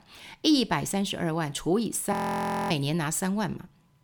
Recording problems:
audio freezing; at 2 s for 0.5 s

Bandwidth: 18.5 kHz